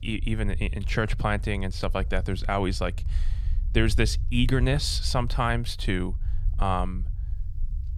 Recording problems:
low rumble; faint; throughout; 25 dB below the speech

